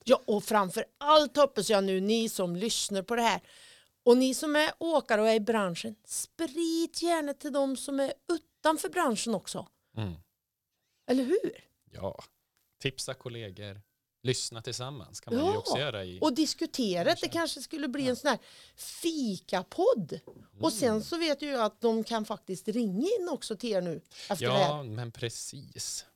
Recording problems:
none

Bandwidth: 18 kHz